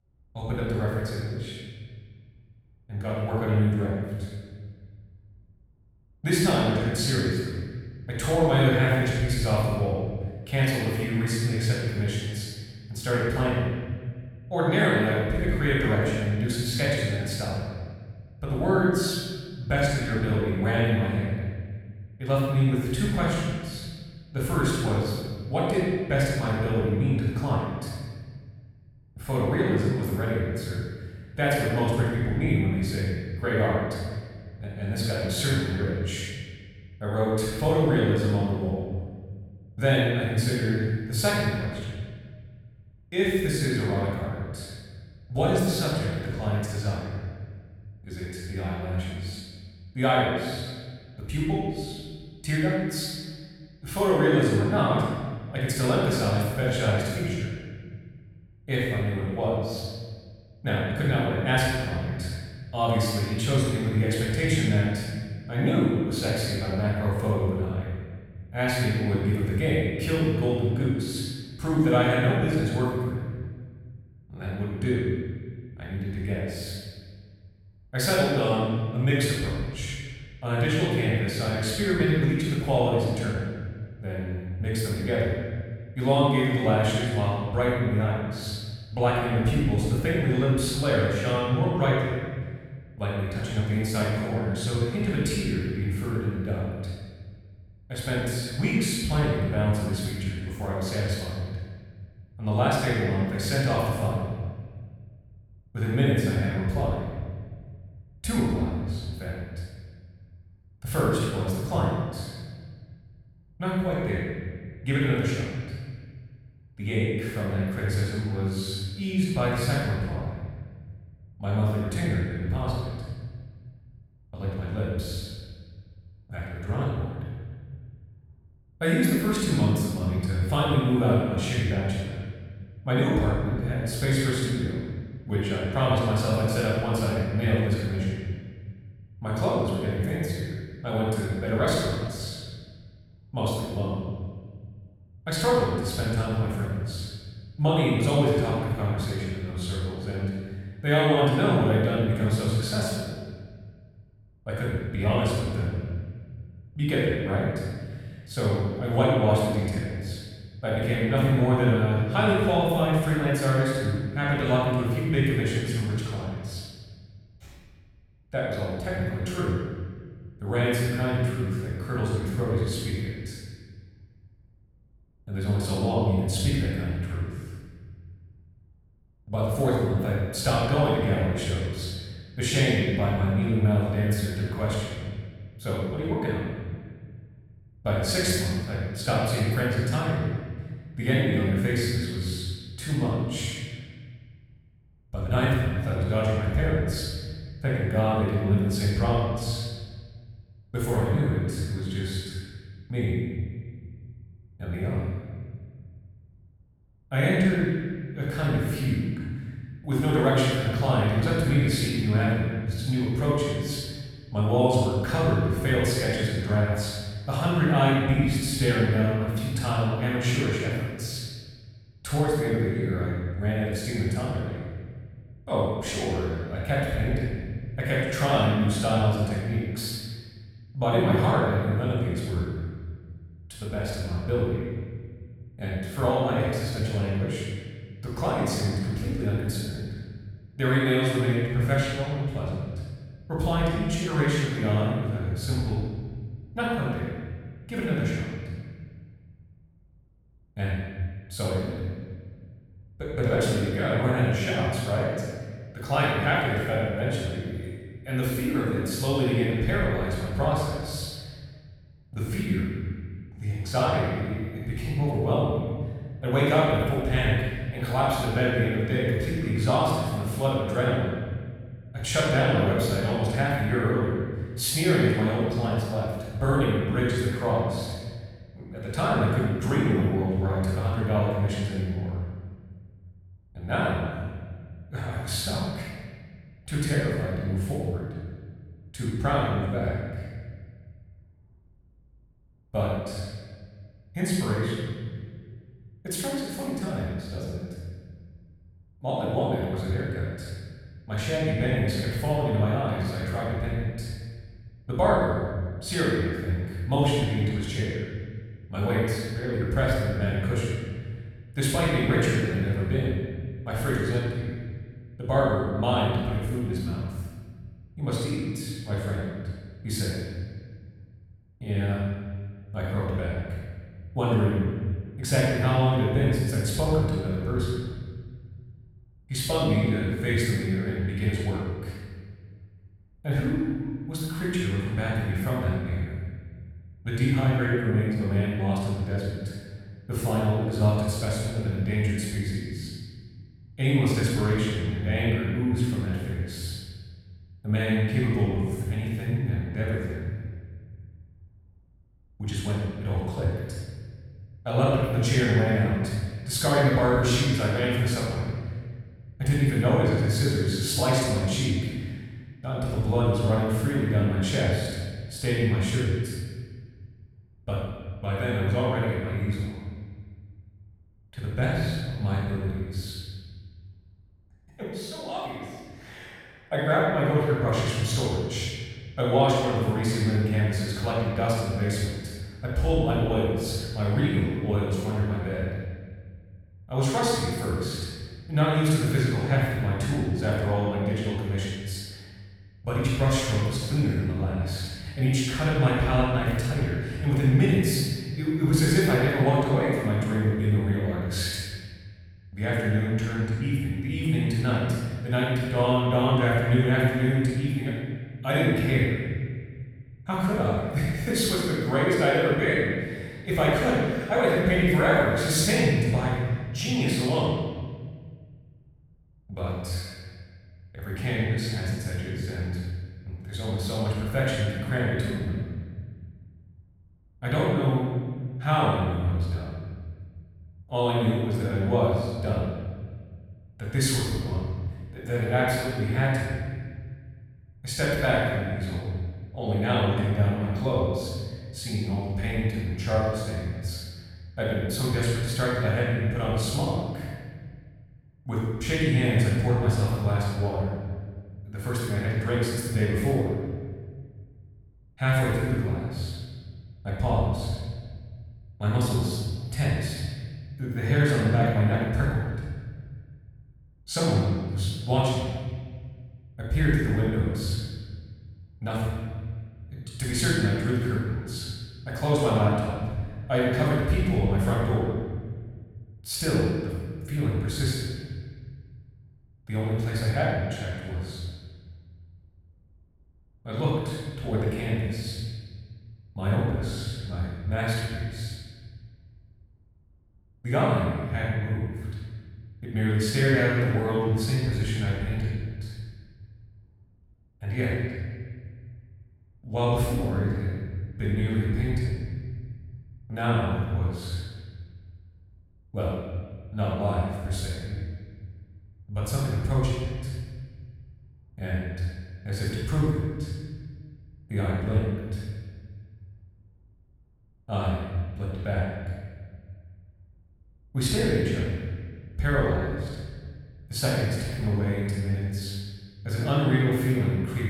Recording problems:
room echo; strong; dies away in 1.6 s
off-mic speech; far

